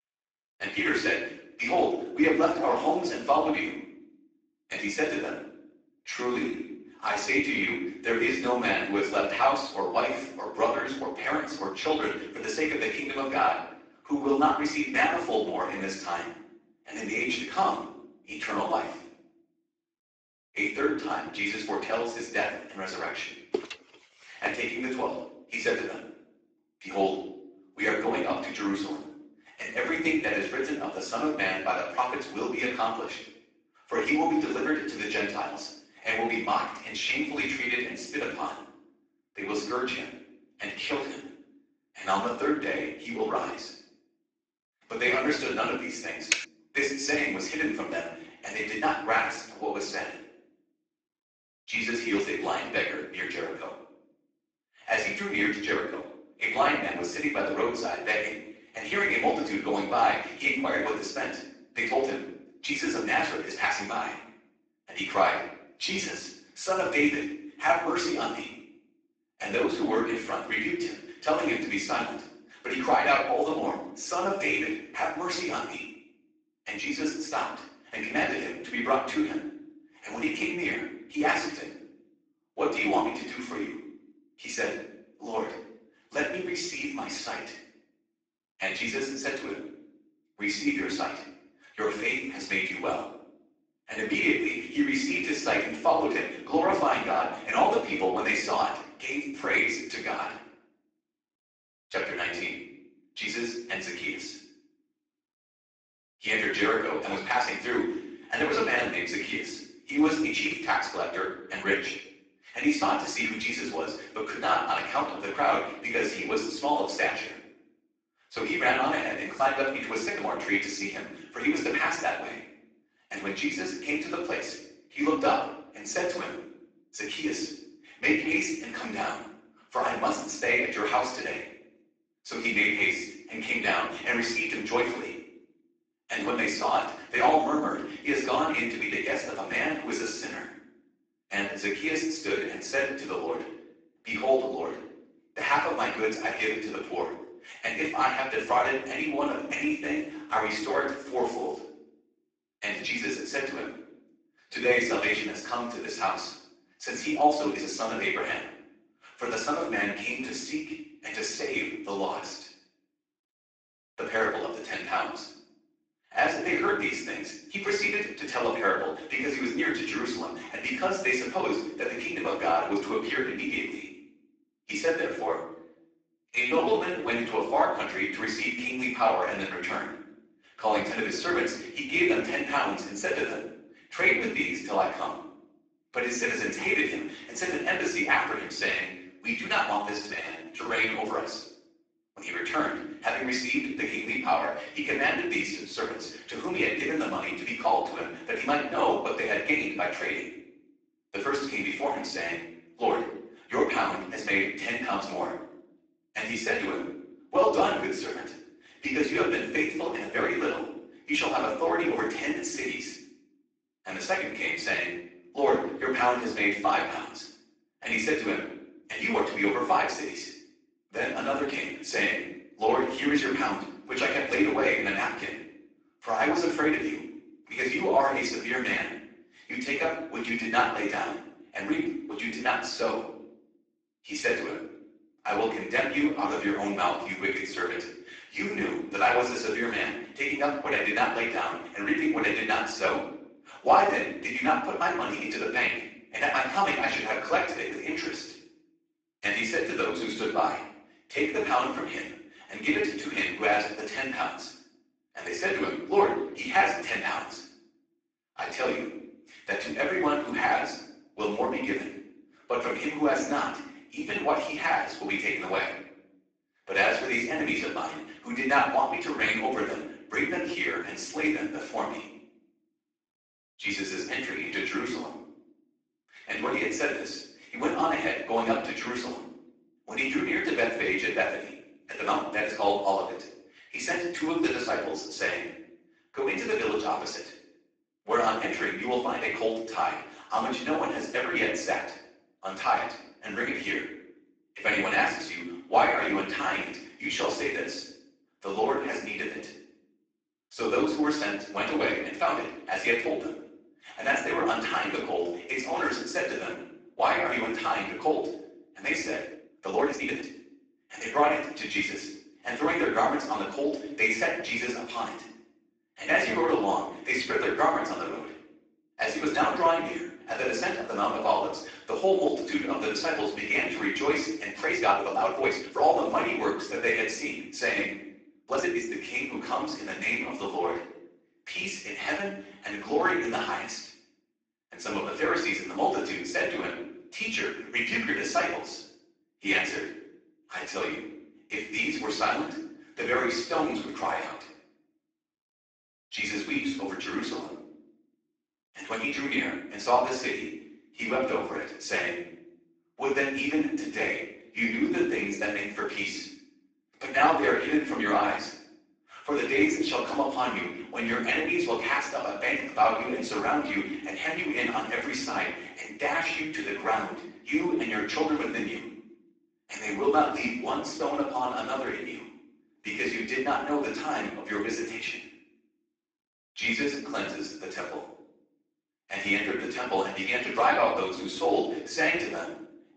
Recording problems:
off-mic speech; far
garbled, watery; badly; nothing above 7.5 kHz
room echo; noticeable; dies away in 0.6 s
thin; somewhat; fading below 300 Hz
uneven, jittery; strongly; from 6 s to 5:29
footsteps; noticeable; at 24 s; peak 6 dB below the speech
keyboard typing; noticeable; at 46 s; peak level with the speech

